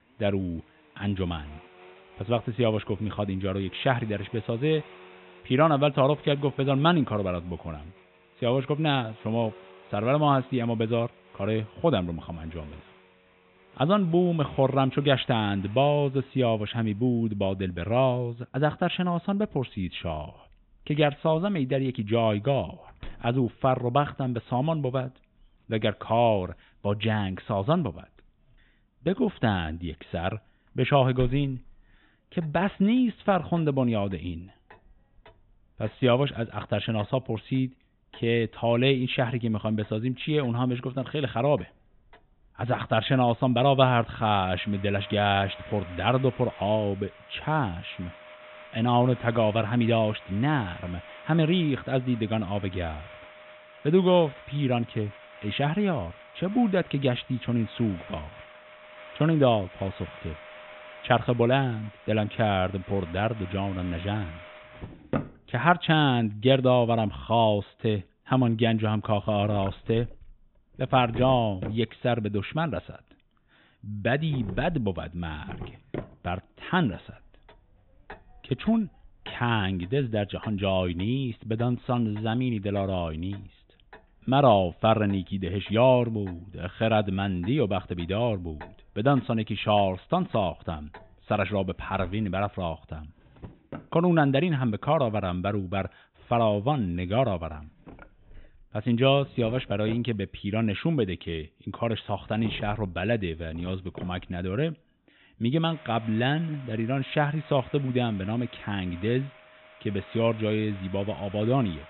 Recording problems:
high frequencies cut off; severe; nothing above 4 kHz
household noises; faint; throughout; 20 dB below the speech

